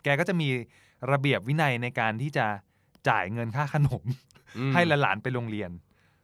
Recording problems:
none

